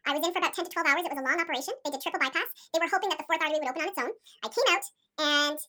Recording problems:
wrong speed and pitch; too fast and too high; 1.7 times normal speed

